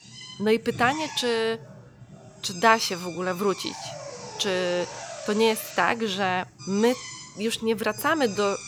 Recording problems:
machinery noise; noticeable; throughout; 15 dB below the speech

